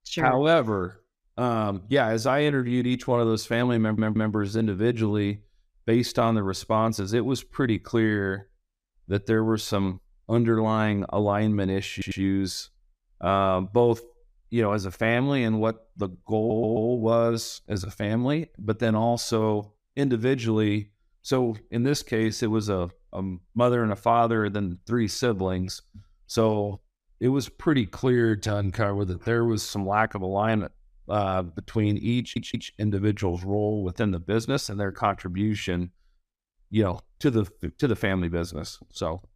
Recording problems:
audio stuttering; 4 times, first at 4 s

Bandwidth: 15 kHz